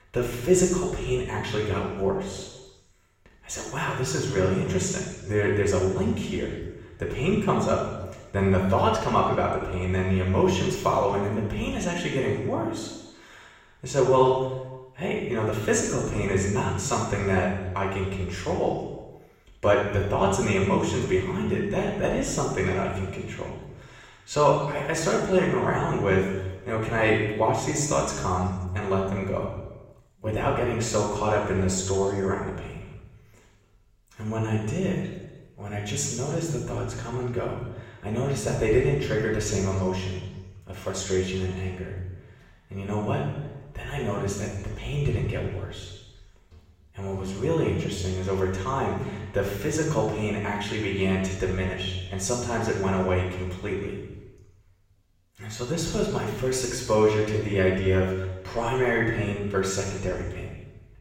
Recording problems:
off-mic speech; far
room echo; noticeable; dies away in 1.1 s

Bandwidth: 16 kHz